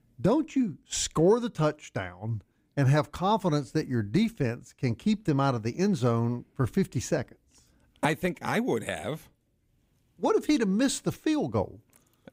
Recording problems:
none

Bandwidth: 15.5 kHz